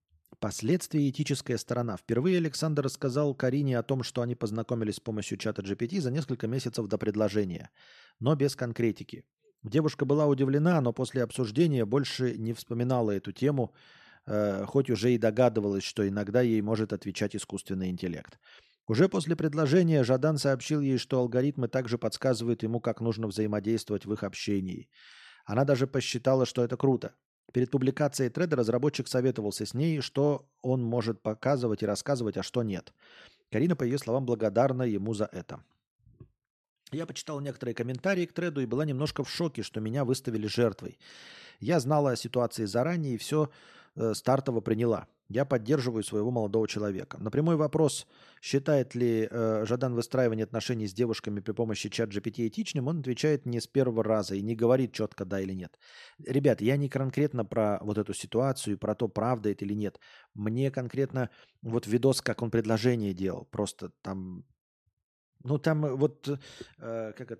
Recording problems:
none

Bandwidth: 13.5 kHz